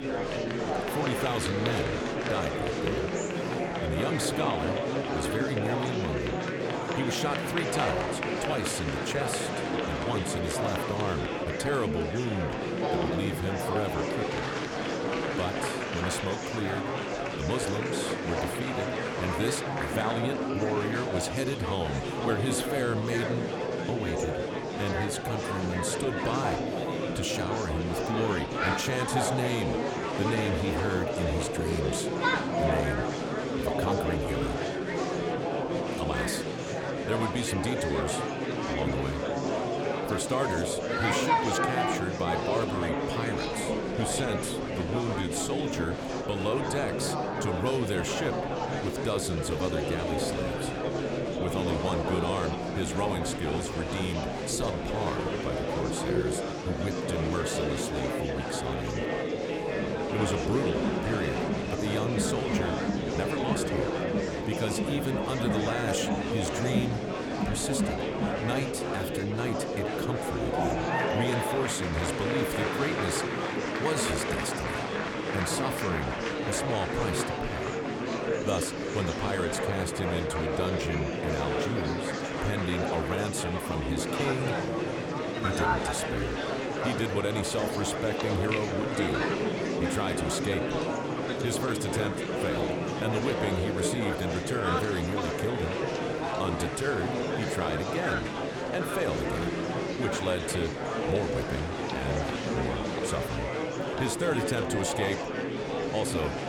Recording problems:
murmuring crowd; very loud; throughout; 3 dB above the speech

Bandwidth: 18.5 kHz